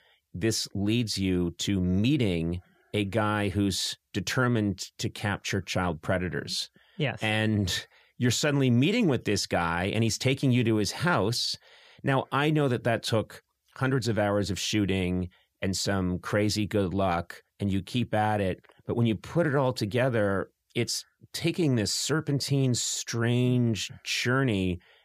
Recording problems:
none

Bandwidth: 14.5 kHz